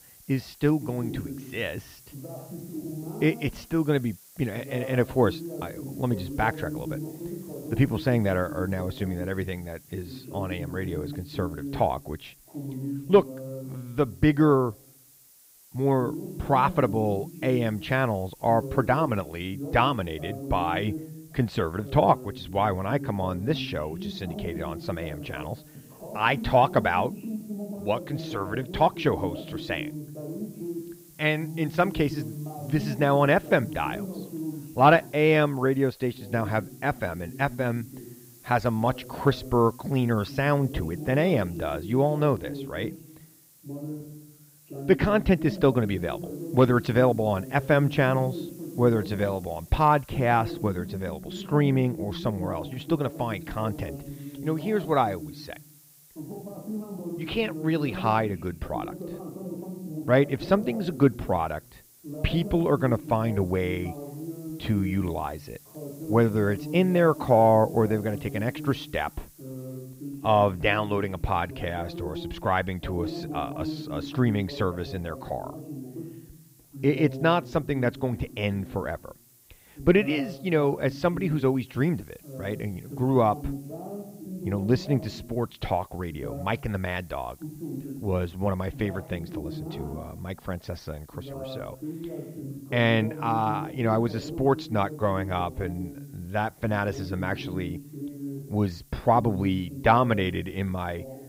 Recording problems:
muffled; slightly; fading above 4 kHz
voice in the background; noticeable; throughout; 10 dB below the speech
hiss; faint; throughout; 25 dB below the speech

